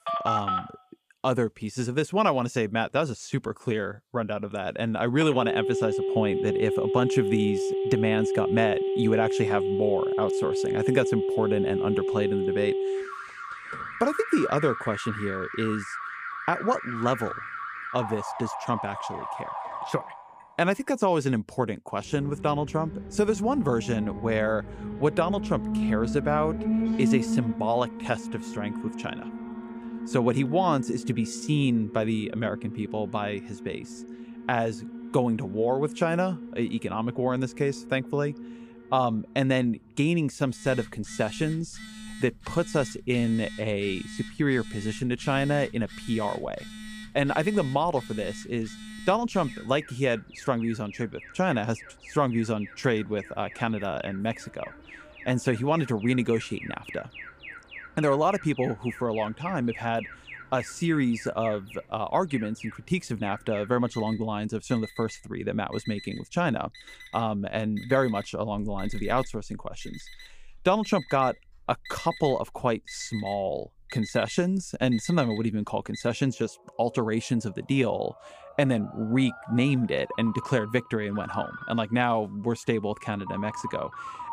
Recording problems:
alarms or sirens; loud; throughout; 6 dB below the speech

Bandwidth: 15 kHz